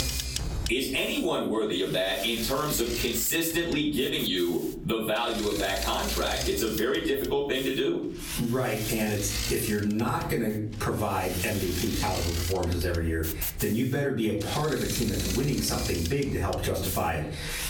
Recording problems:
off-mic speech; far
room echo; slight; dies away in 0.4 s
squashed, flat; somewhat, background pumping
machinery noise; loud; throughout; 7 dB below the speech

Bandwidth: 17 kHz